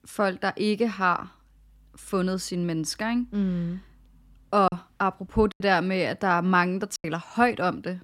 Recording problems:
choppy; occasionally; 3% of the speech affected

